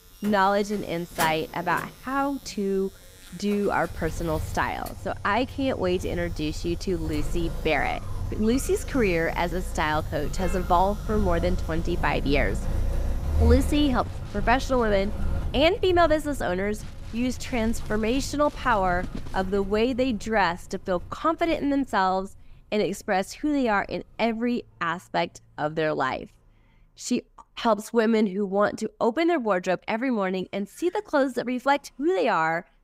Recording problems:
traffic noise; loud; throughout; 8 dB below the speech
household noises; faint; until 20 s; 25 dB below the speech

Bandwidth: 15.5 kHz